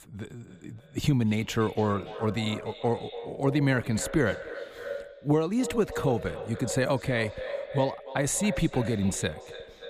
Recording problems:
echo of what is said; strong; throughout; 290 ms later, 10 dB below the speech

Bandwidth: 15 kHz